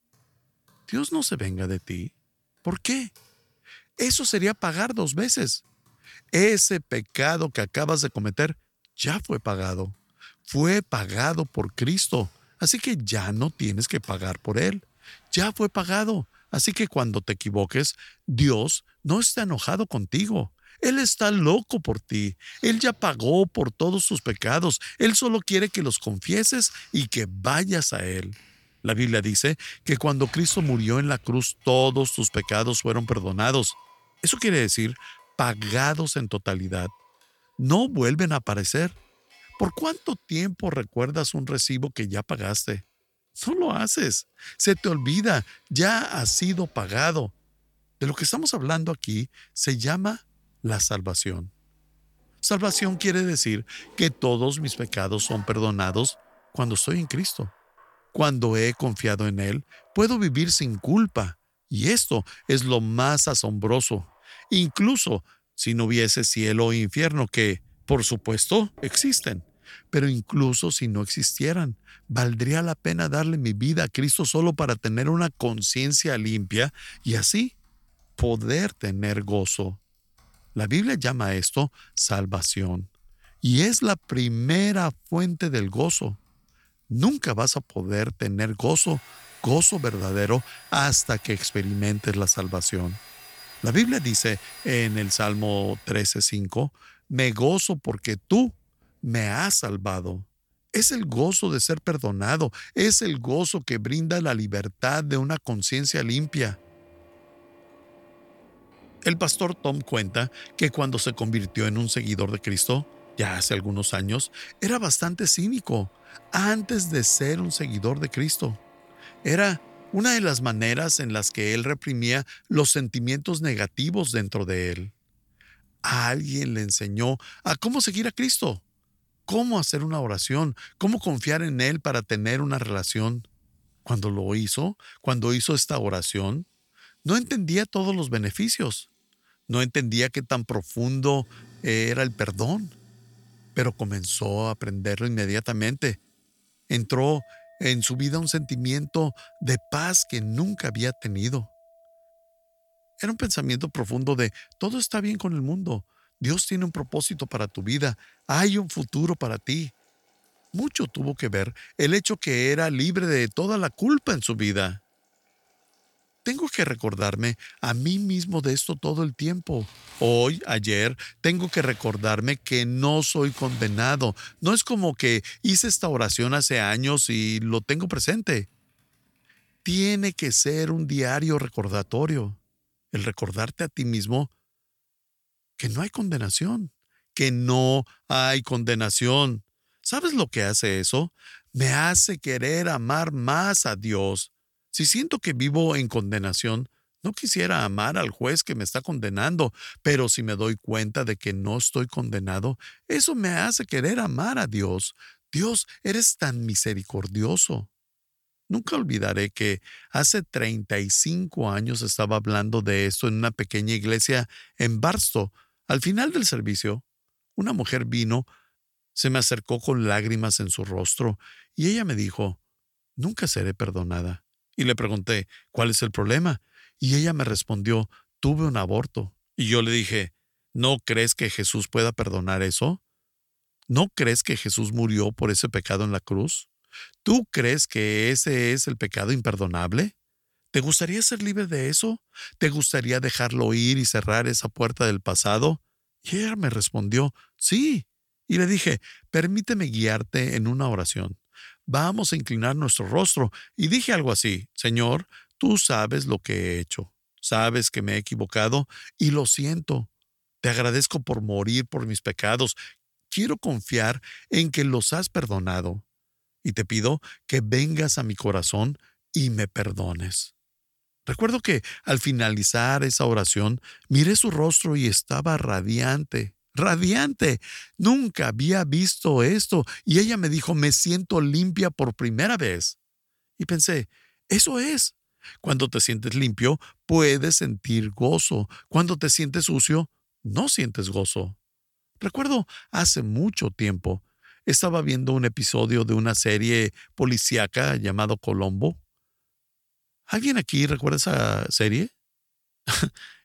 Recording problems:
household noises; faint; until 3:02; 25 dB below the speech

